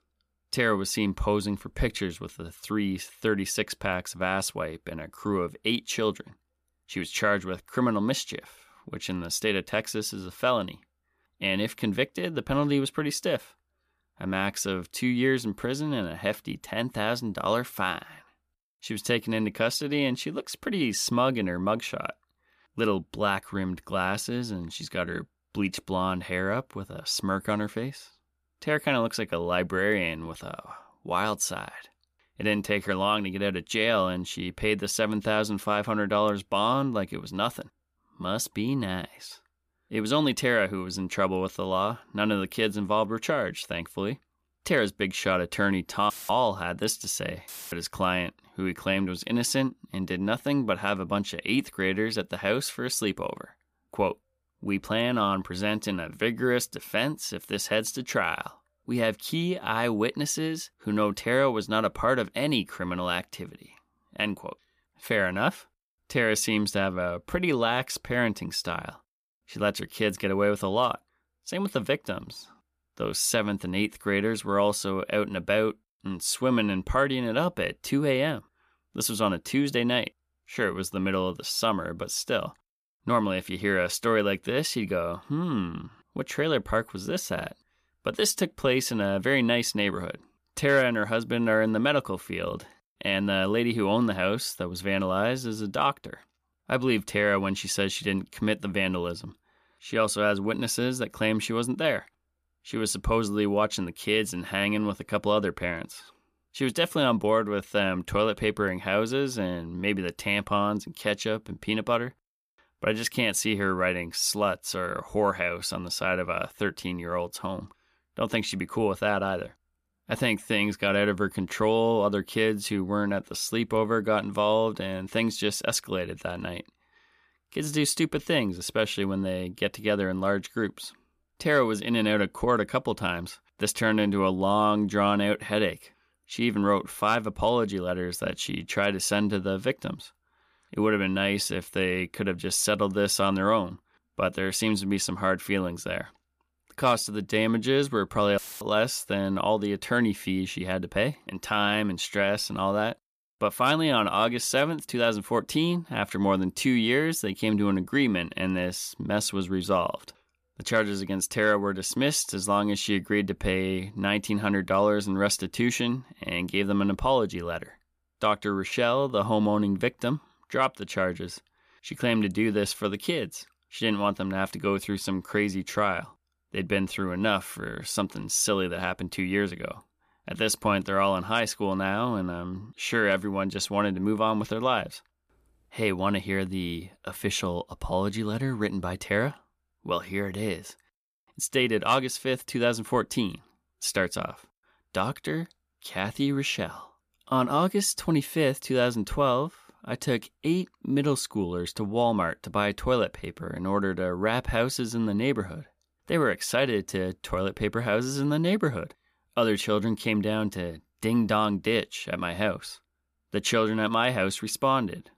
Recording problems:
audio cutting out; filled with static; at 46 s, at 47 s and at 2:28

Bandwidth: 14.5 kHz